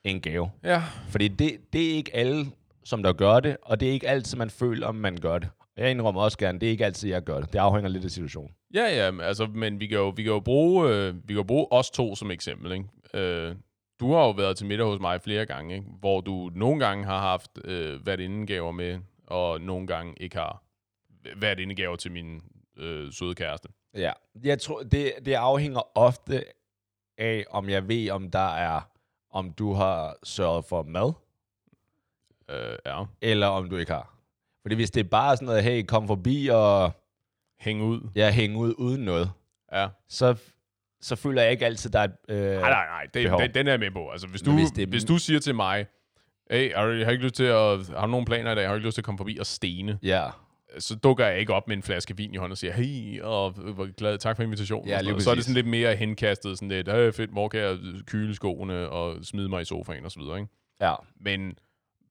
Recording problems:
none

